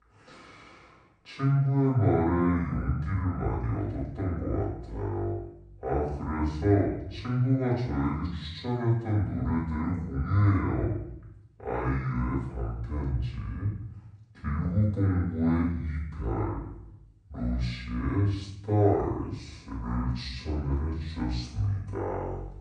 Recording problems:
off-mic speech; far
wrong speed and pitch; too slow and too low; 0.6 times normal speed
room echo; noticeable; dies away in 0.7 s

